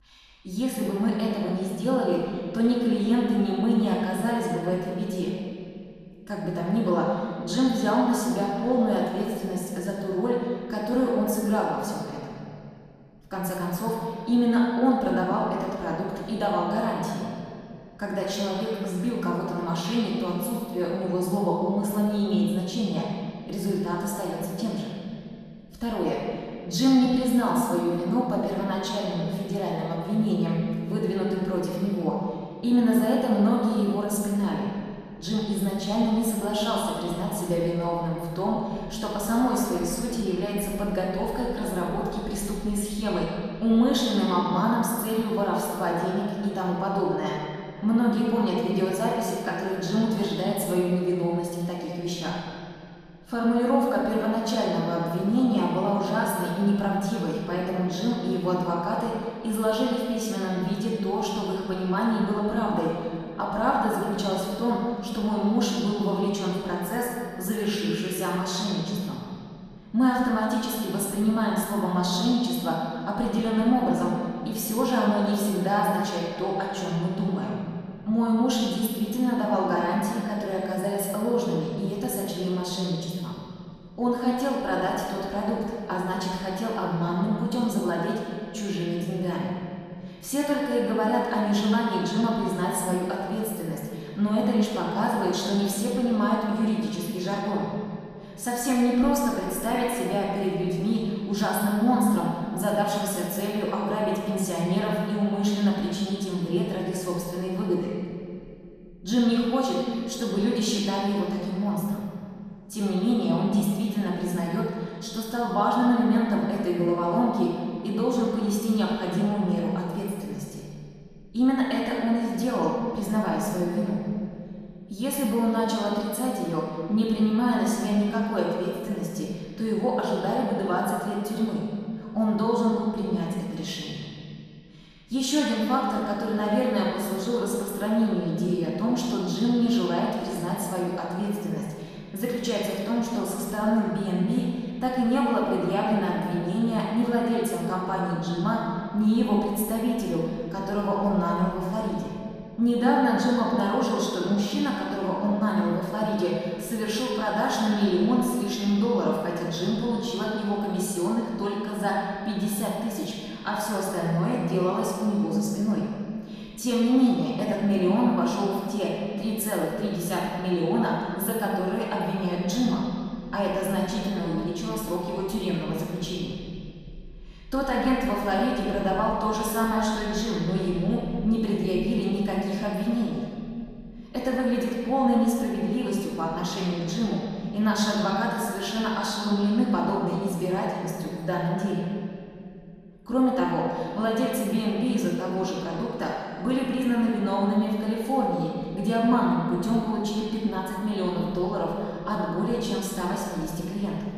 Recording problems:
room echo; strong; dies away in 2.3 s
off-mic speech; far

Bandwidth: 14 kHz